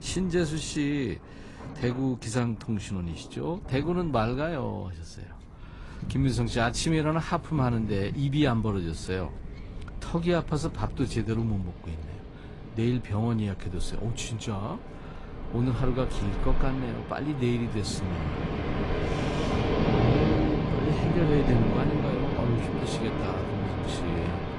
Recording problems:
garbled, watery; slightly; nothing above 10 kHz
rain or running water; loud; throughout; 1 dB below the speech
wind noise on the microphone; occasional gusts; 20 dB below the speech

